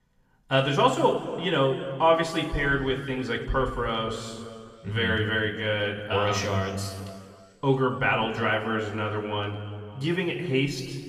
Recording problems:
room echo; noticeable; dies away in 1.9 s
off-mic speech; somewhat distant

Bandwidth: 14.5 kHz